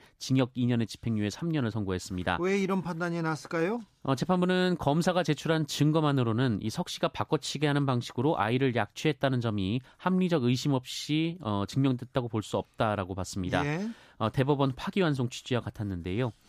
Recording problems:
none

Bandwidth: 14.5 kHz